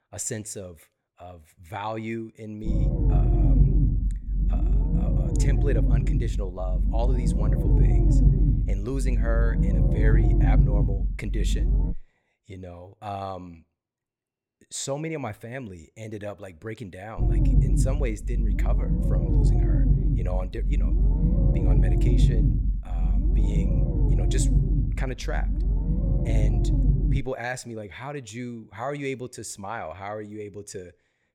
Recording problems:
low rumble; loud; from 2.5 to 12 s and from 17 to 27 s; 1 dB below the speech

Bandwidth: 17.5 kHz